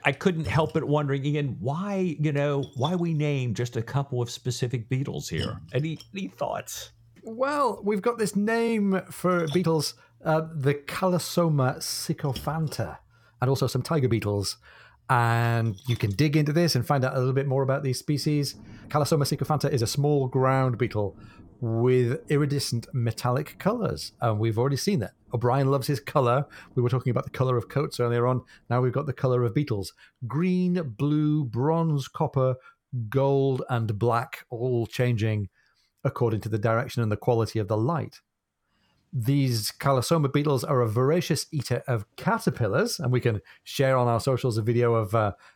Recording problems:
rain or running water; faint; throughout; 20 dB below the speech
uneven, jittery; strongly; from 2 to 43 s

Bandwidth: 17.5 kHz